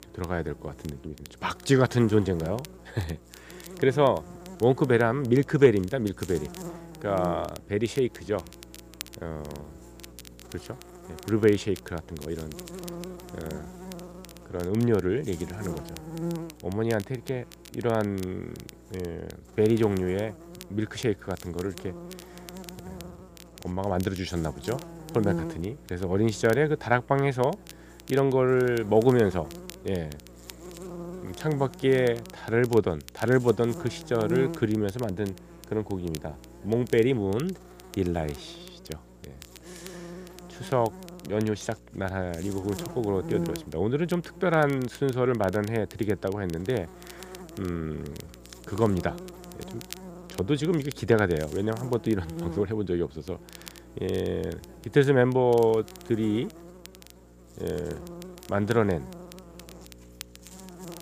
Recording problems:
electrical hum; noticeable; throughout; 60 Hz, 20 dB below the speech
crackle, like an old record; faint; 20 dB below the speech

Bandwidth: 15 kHz